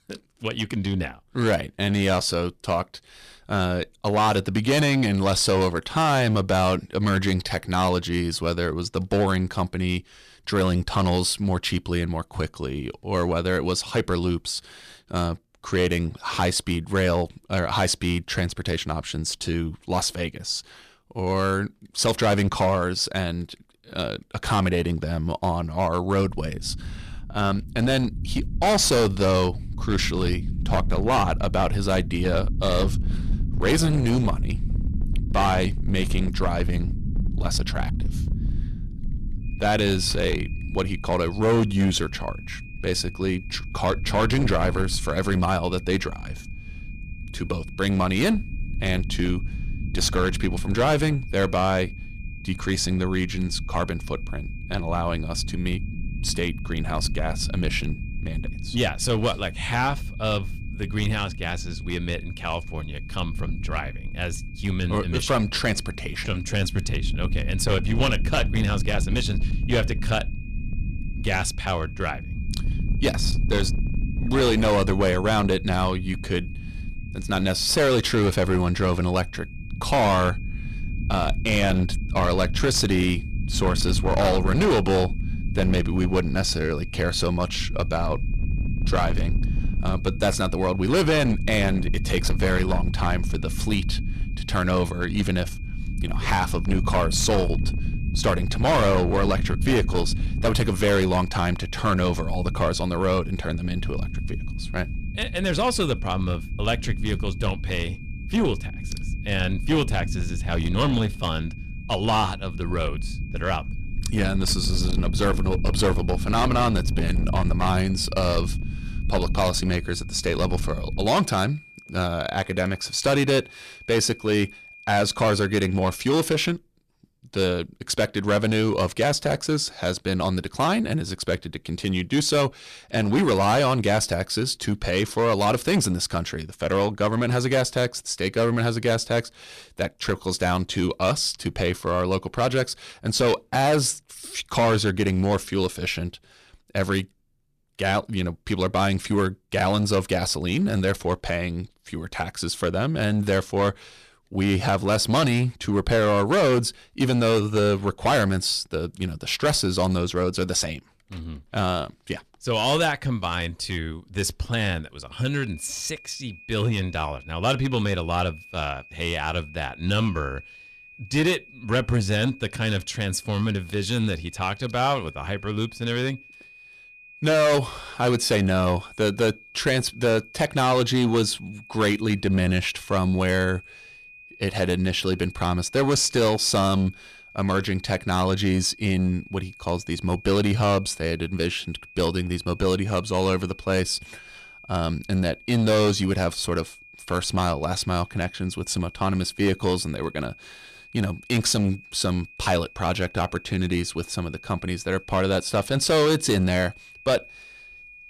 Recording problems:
distortion; slight; 7% of the sound clipped
low rumble; noticeable; from 26 s to 2:01; 15 dB below the speech
high-pitched whine; faint; from 39 s to 2:06 and from 2:45 on; 2.5 kHz, 20 dB below the speech

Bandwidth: 14.5 kHz